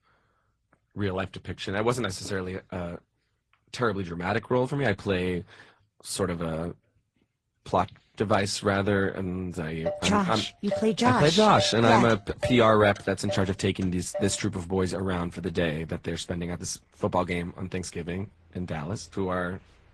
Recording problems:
garbled, watery; slightly
traffic noise; noticeable; from 9.5 s on; 10 dB below the speech

